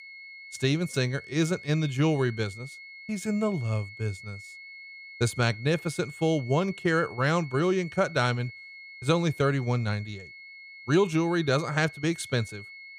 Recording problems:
high-pitched whine; noticeable; throughout; 2 kHz, 15 dB below the speech

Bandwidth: 15 kHz